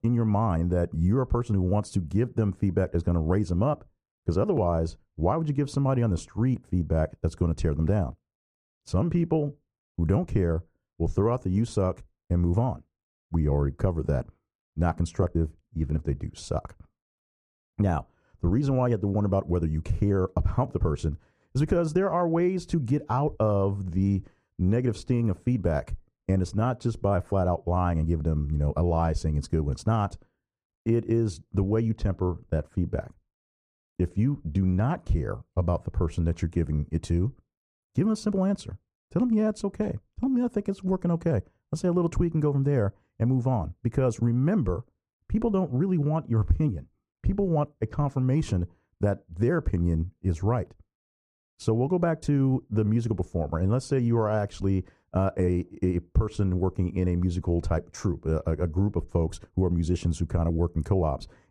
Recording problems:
muffled; very; fading above 2 kHz

